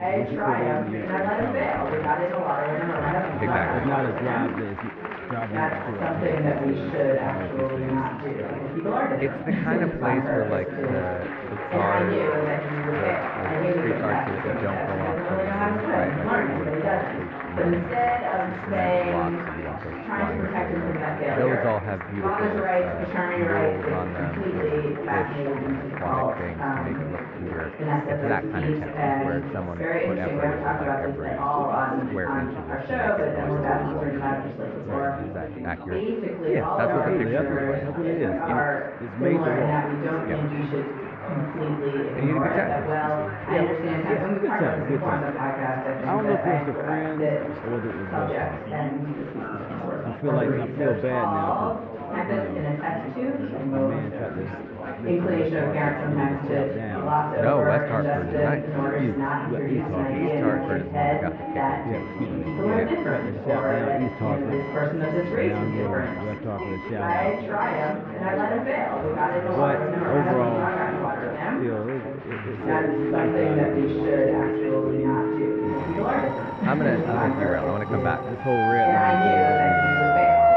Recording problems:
muffled; very; fading above 2 kHz
alarms or sirens; very loud; from 1:00 on; 6 dB above the speech
chatter from many people; very loud; throughout; 5 dB above the speech

